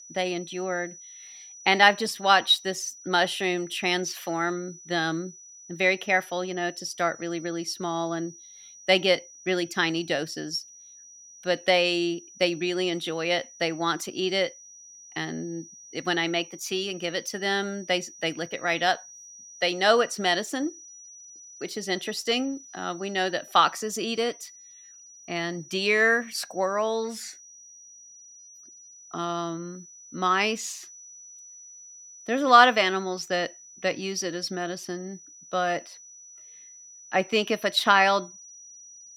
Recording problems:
high-pitched whine; noticeable; throughout; 6 kHz, 20 dB below the speech

